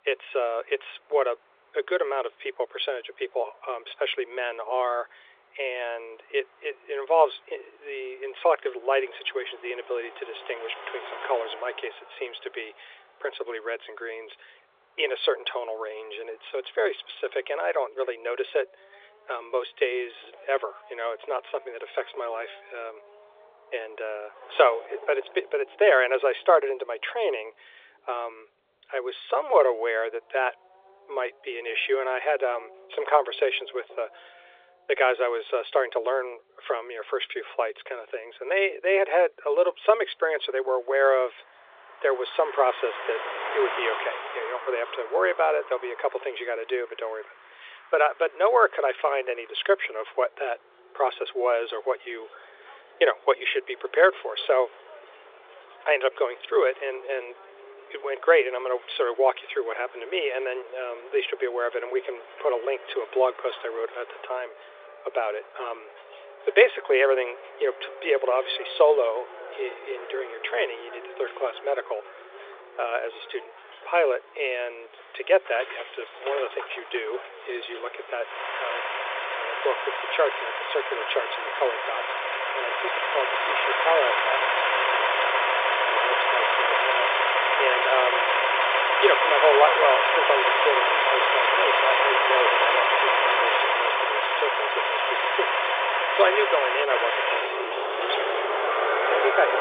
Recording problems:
phone-call audio
traffic noise; very loud; throughout; 4 dB above the speech

